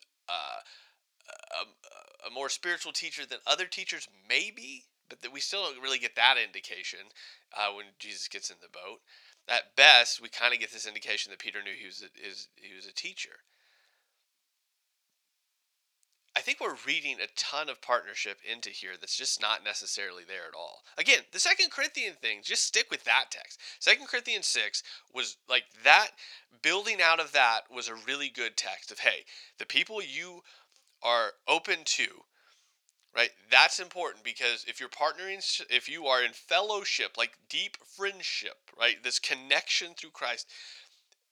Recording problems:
thin; very; fading below 950 Hz

